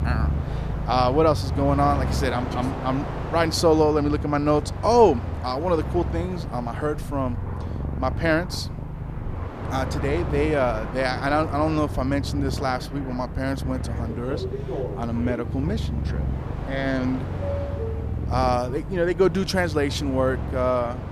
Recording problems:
animal sounds; loud; throughout; 6 dB below the speech
train or aircraft noise; noticeable; throughout; 10 dB below the speech

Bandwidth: 14.5 kHz